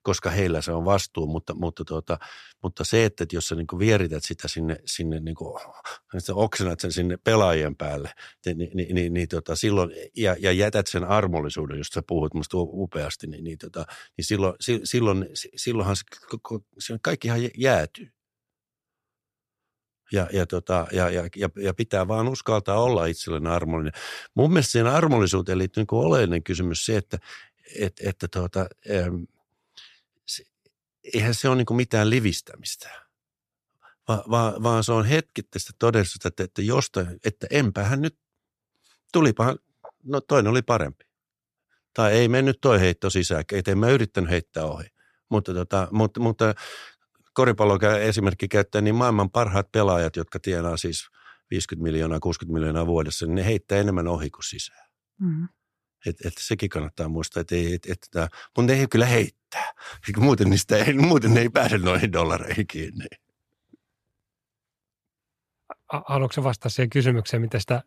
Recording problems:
none

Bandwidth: 14.5 kHz